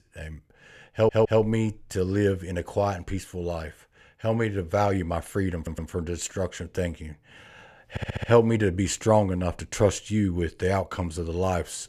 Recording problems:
audio stuttering; at 1 s, at 5.5 s and at 8 s

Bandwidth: 14.5 kHz